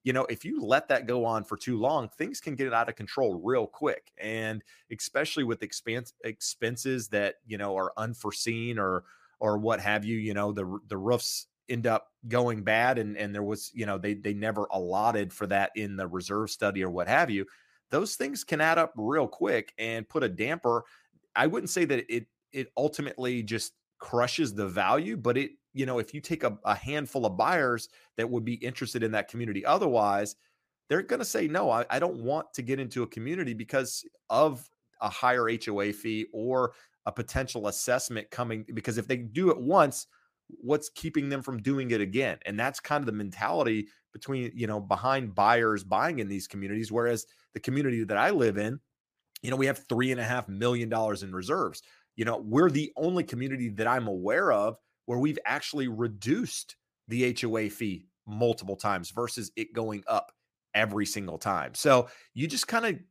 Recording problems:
none

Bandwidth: 15 kHz